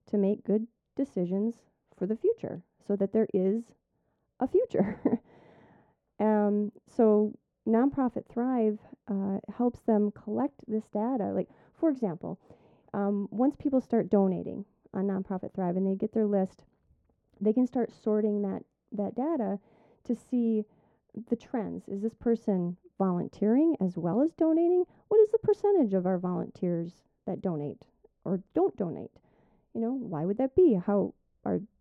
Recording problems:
muffled; very; fading above 1.5 kHz

